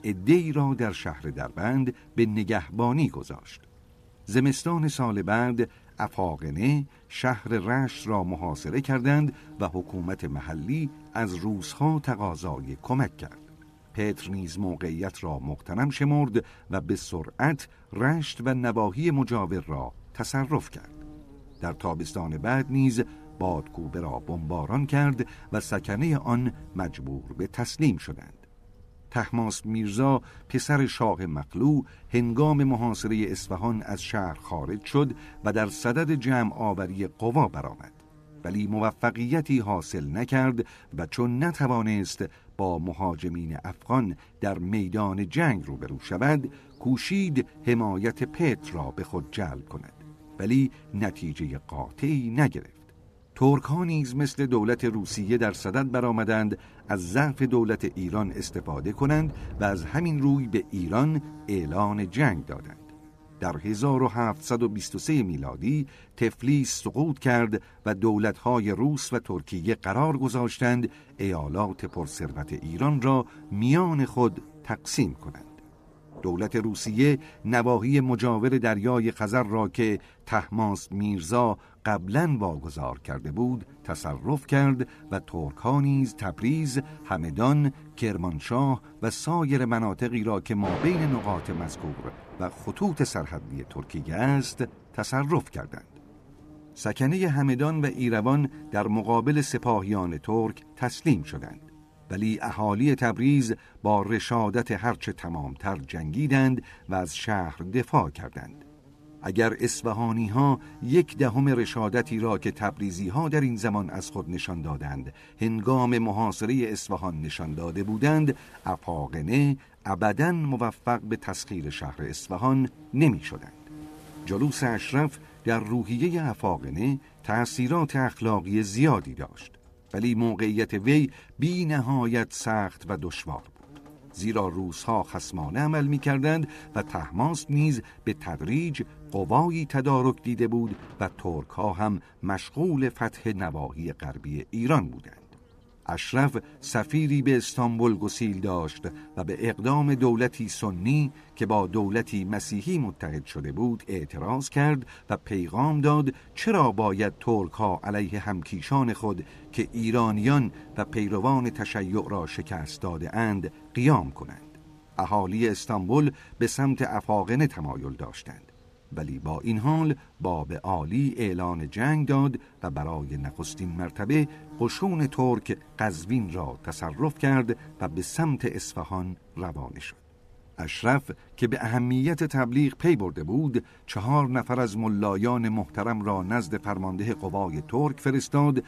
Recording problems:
electrical hum; faint; throughout; 60 Hz, 25 dB below the speech
rain or running water; faint; throughout; 25 dB below the speech

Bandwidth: 14.5 kHz